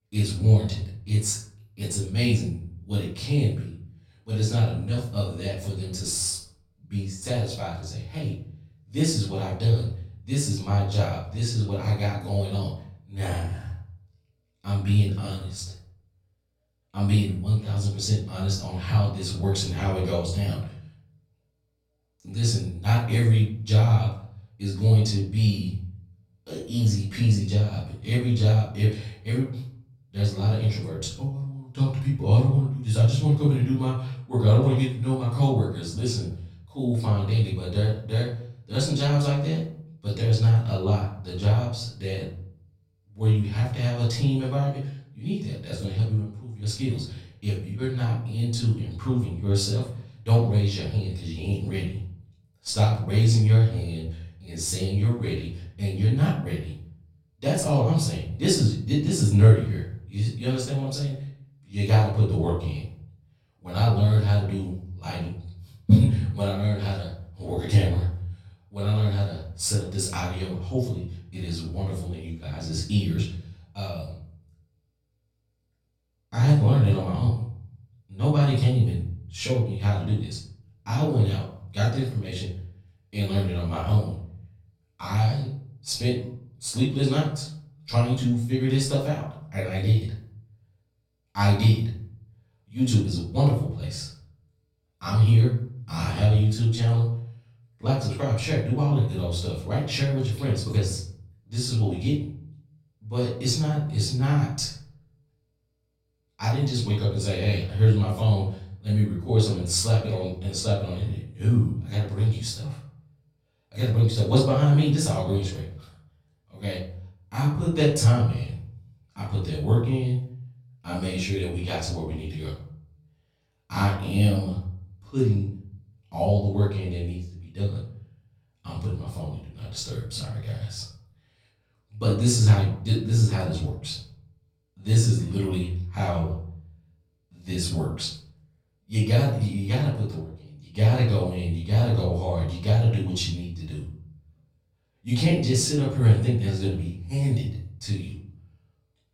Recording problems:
off-mic speech; far
room echo; noticeable; dies away in 0.5 s

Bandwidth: 17 kHz